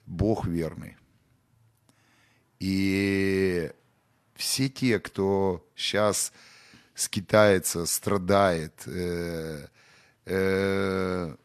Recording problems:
none

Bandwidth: 13.5 kHz